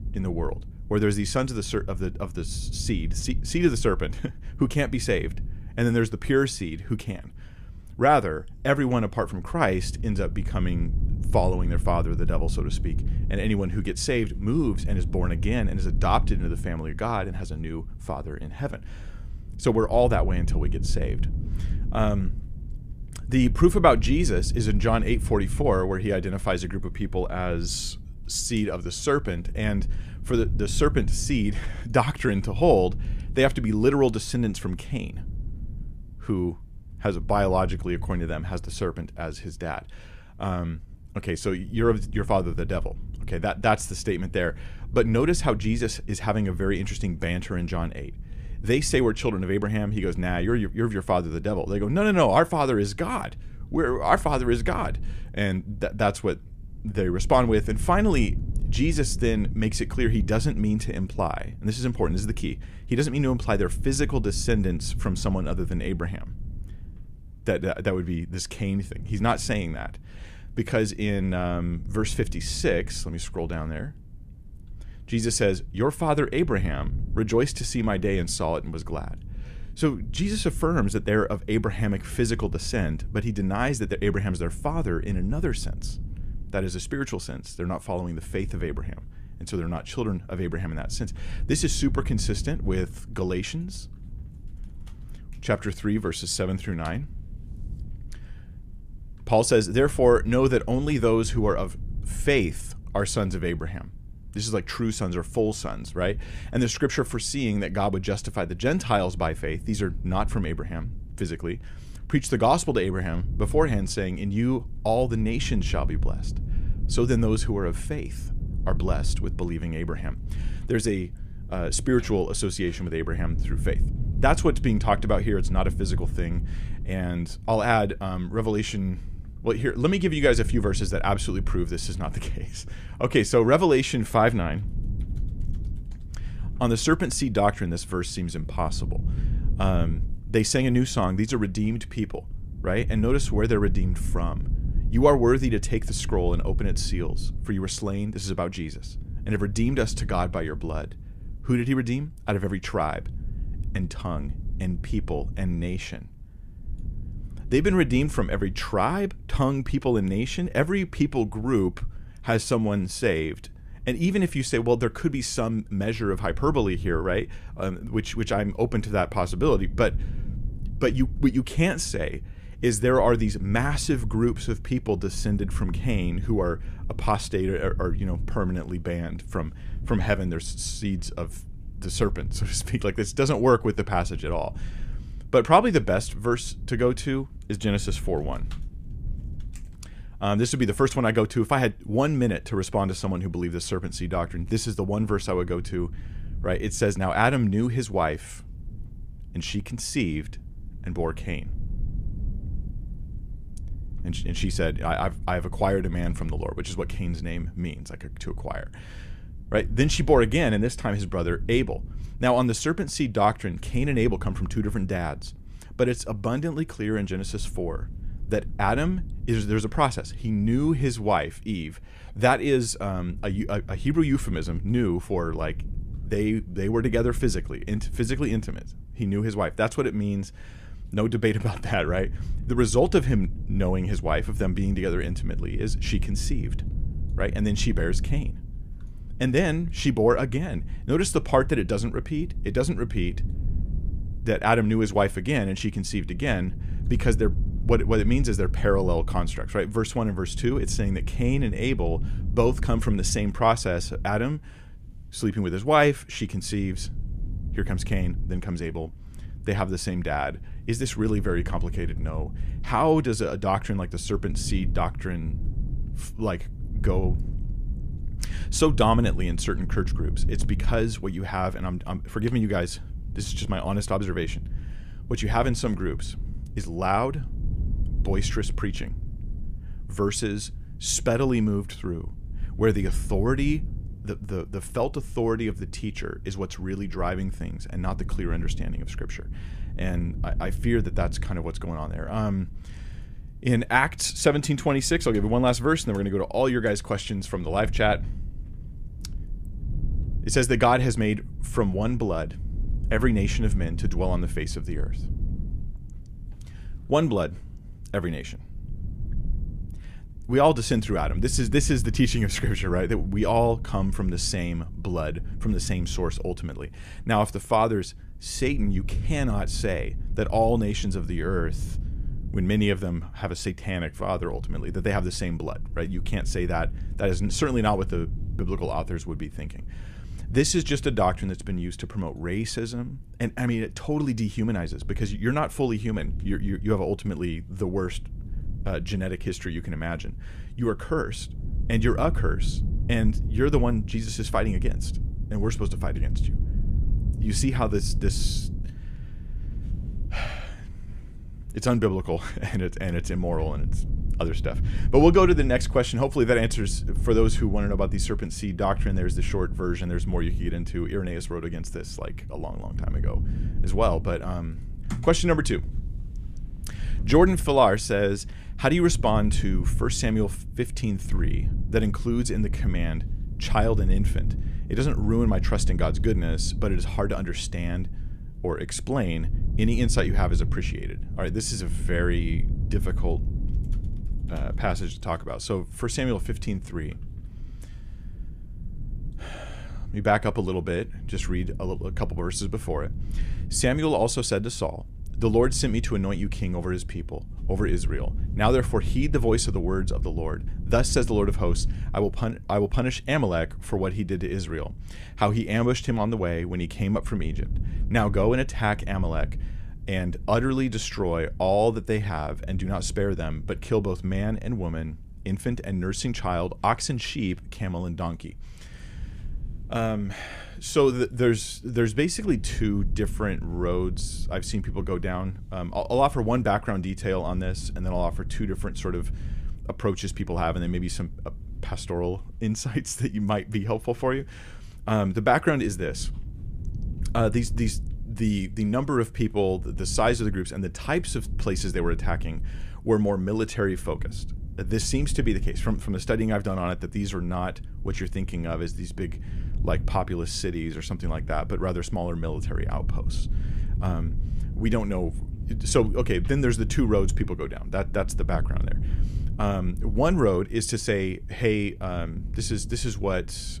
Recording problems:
low rumble; faint; throughout; 20 dB below the speech

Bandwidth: 14.5 kHz